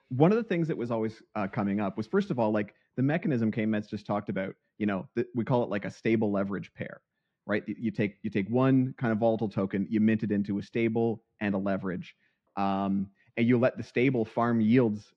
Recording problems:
muffled; slightly; fading above 3 kHz

